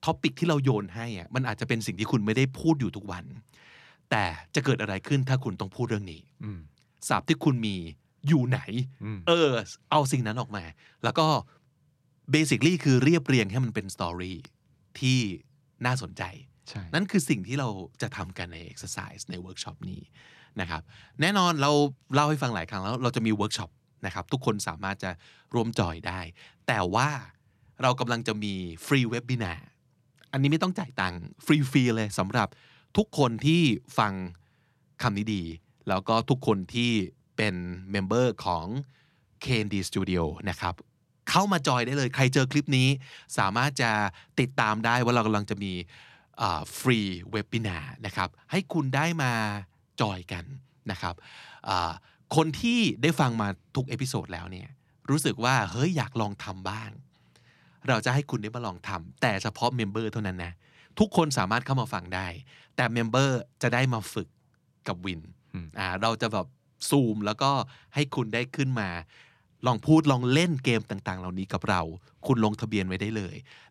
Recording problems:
none

